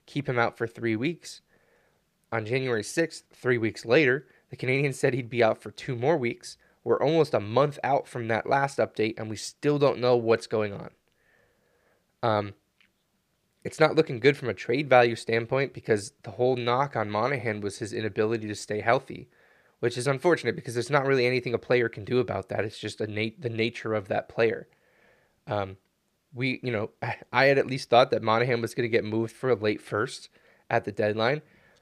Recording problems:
none

